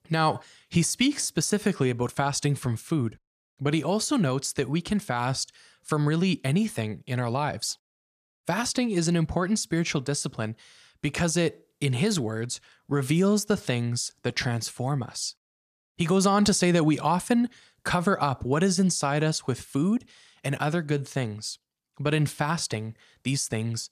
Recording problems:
none

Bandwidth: 14.5 kHz